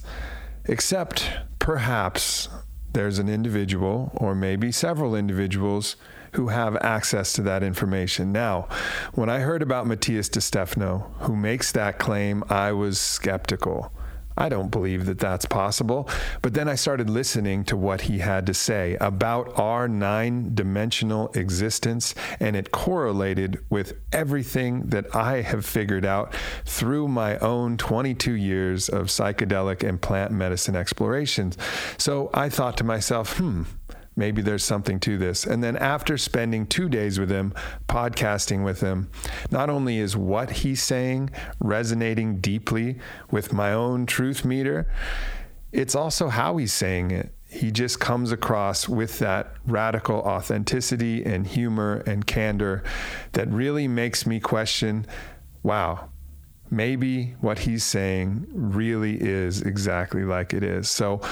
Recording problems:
squashed, flat; heavily

